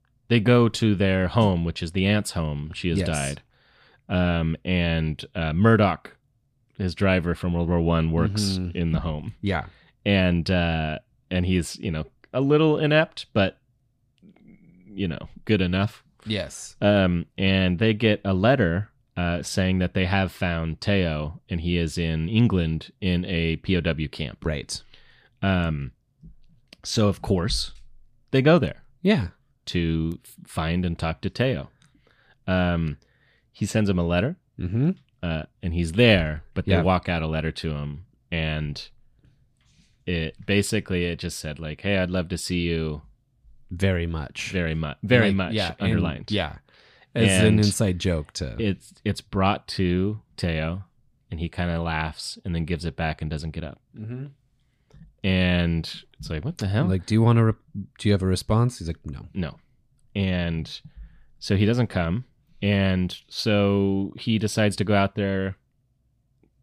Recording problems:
none

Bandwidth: 15 kHz